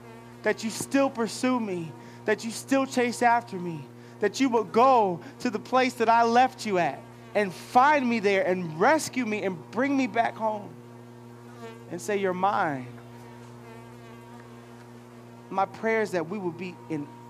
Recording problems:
electrical hum; faint; throughout; 60 Hz, 25 dB below the speech

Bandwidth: 15 kHz